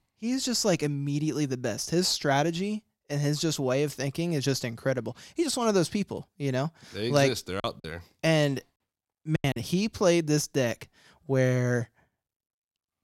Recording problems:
choppy; very; from 7.5 to 9.5 s; 14% of the speech affected

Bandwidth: 16 kHz